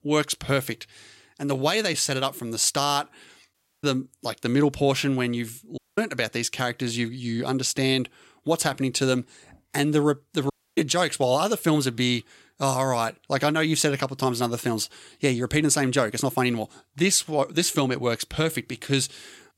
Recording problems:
audio cutting out; at 3.5 s, at 6 s and at 11 s

